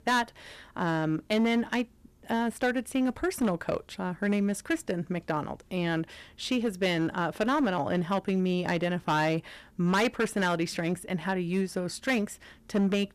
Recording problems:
distortion; slight; 6% of the sound clipped

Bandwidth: 14.5 kHz